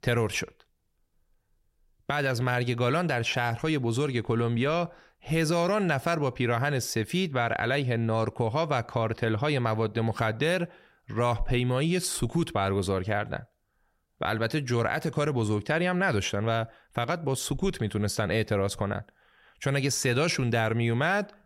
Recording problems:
none

